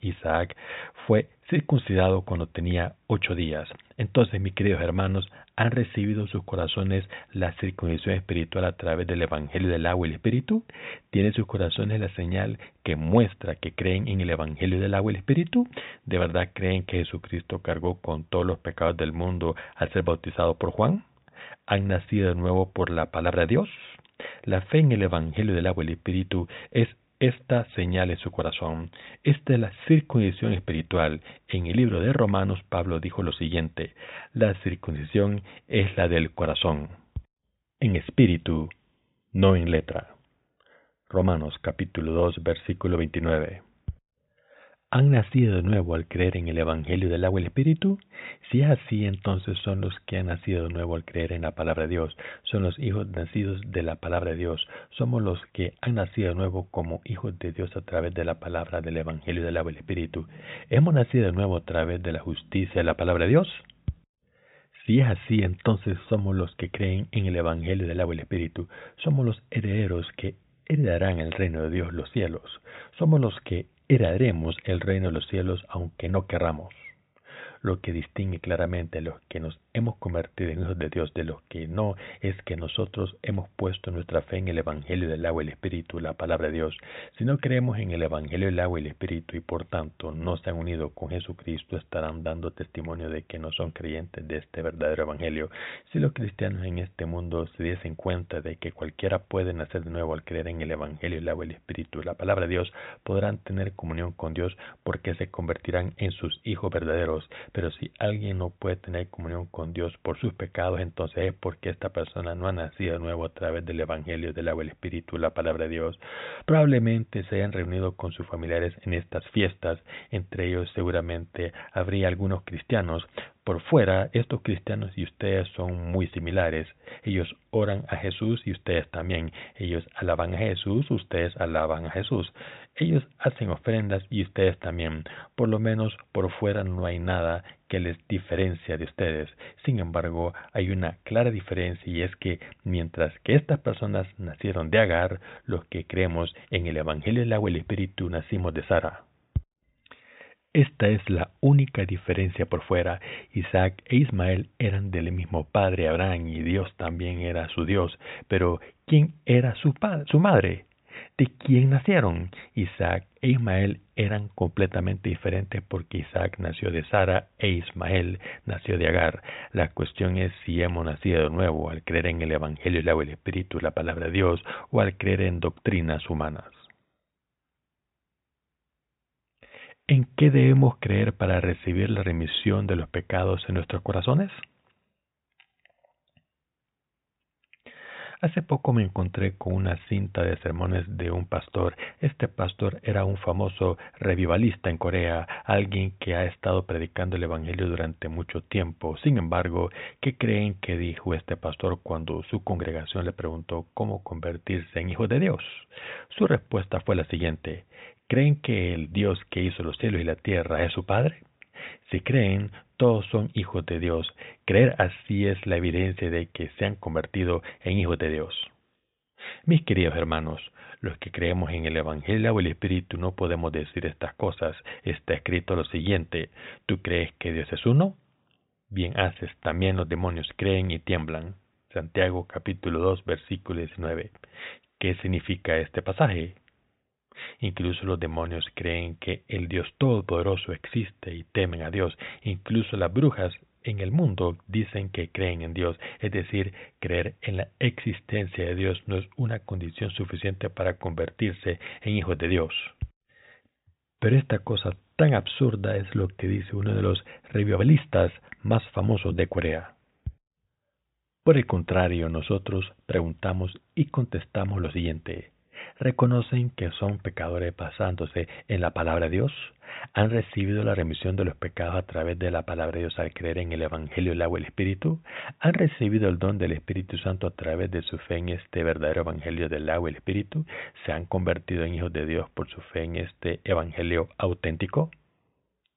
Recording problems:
high frequencies cut off; severe; nothing above 4 kHz

